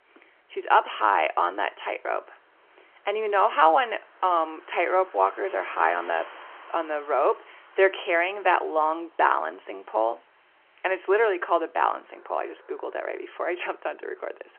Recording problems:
phone-call audio
traffic noise; faint; throughout; 25 dB below the speech

